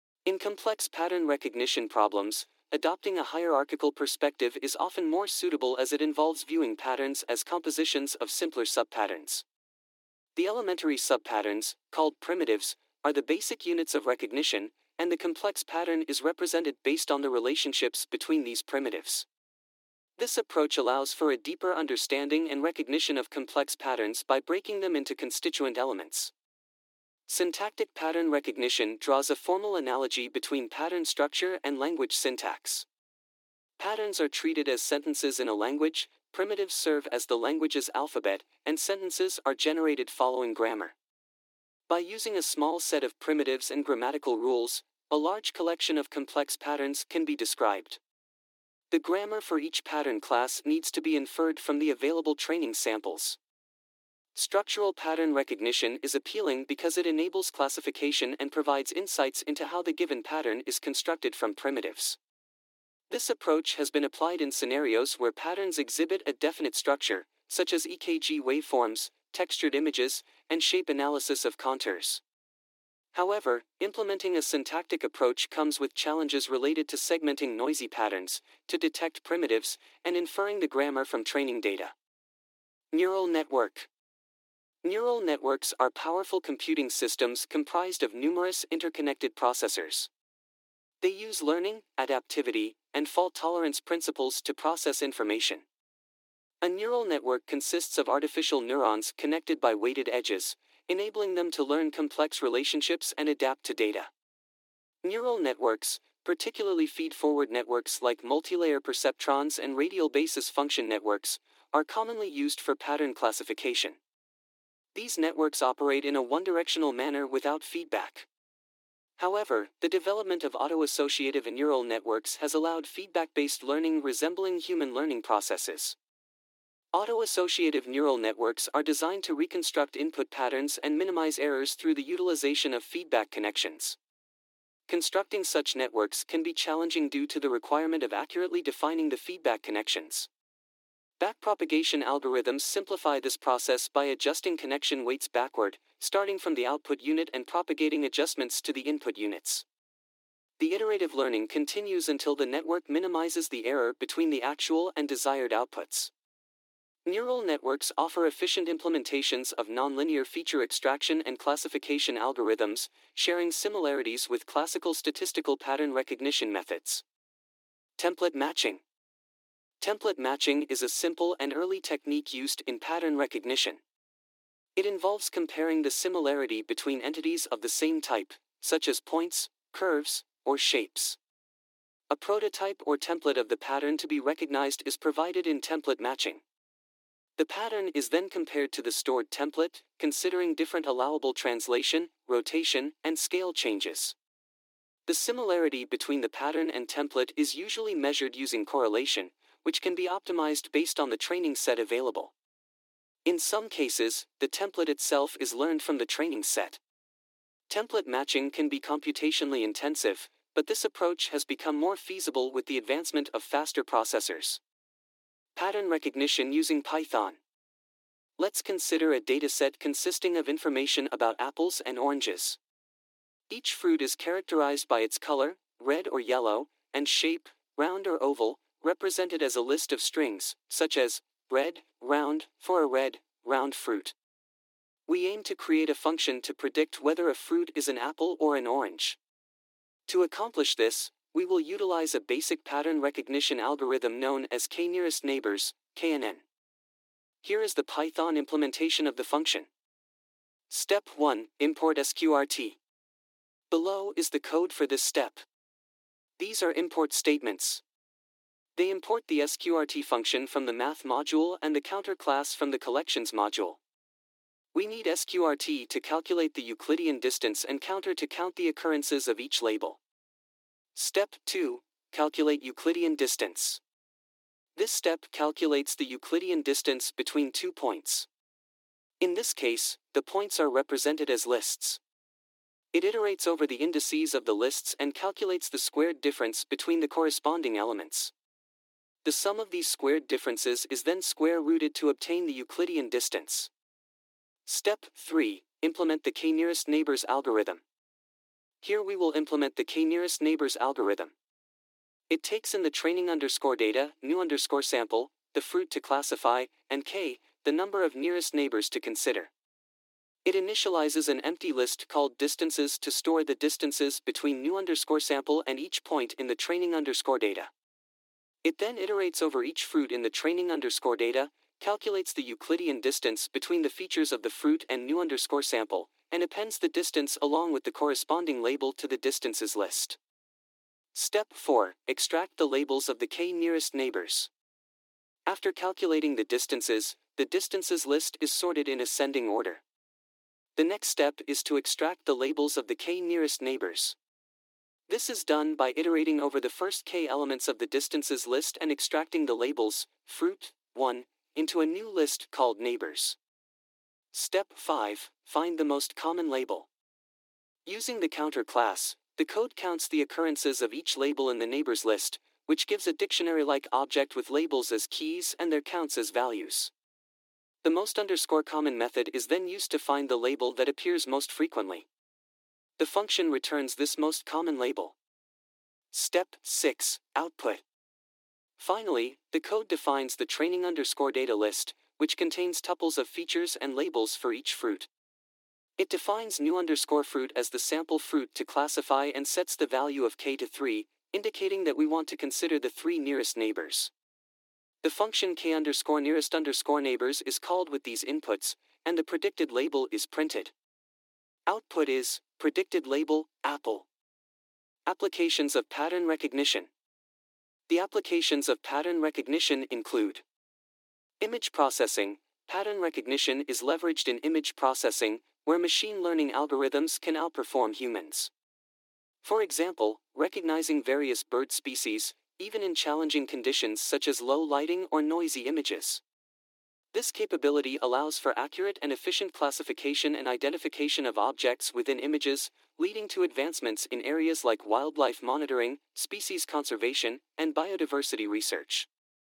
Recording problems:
thin; somewhat; fading below 300 Hz

